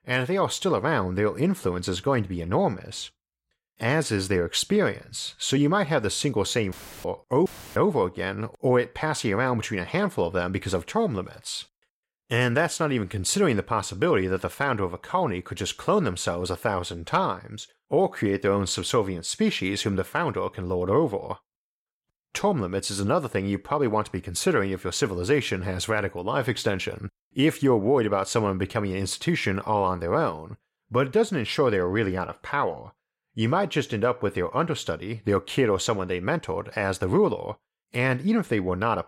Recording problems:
audio cutting out; filled with static; at 6.5 s and at 7.5 s

